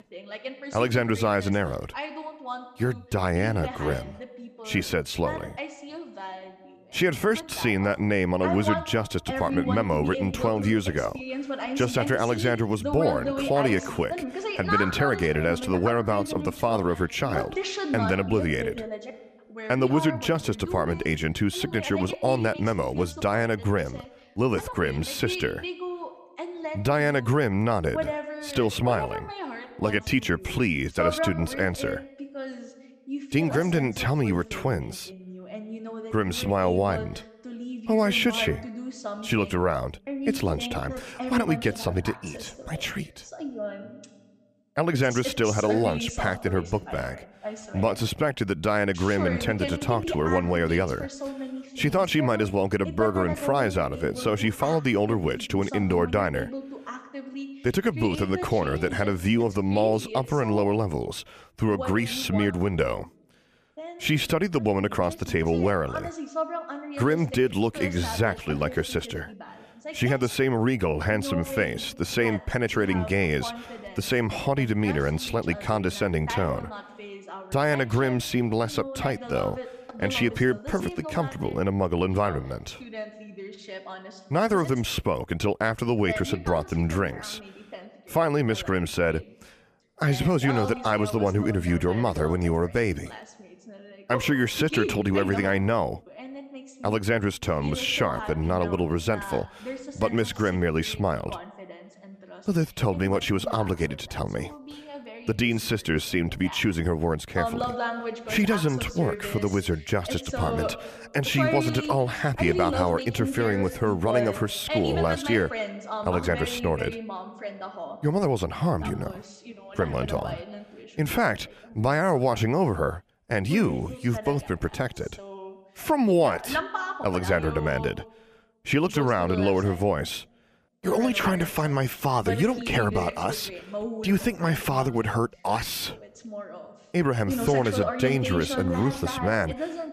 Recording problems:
voice in the background; loud; throughout; 9 dB below the speech

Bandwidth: 14.5 kHz